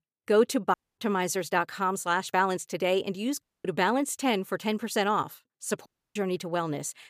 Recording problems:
audio cutting out; at 0.5 s, at 3.5 s and at 6 s

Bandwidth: 15 kHz